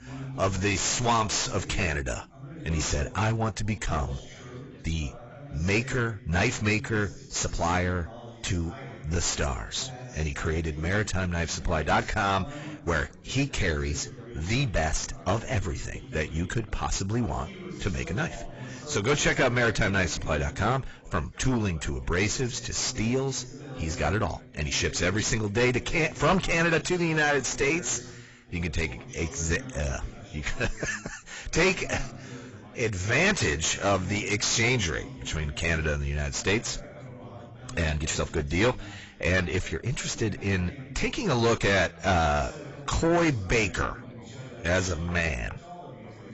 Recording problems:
distortion; heavy; 5 dB below the speech
garbled, watery; badly; nothing above 7.5 kHz
background chatter; noticeable; throughout; 2 voices, 15 dB below the speech
uneven, jittery; strongly; from 7 to 45 s

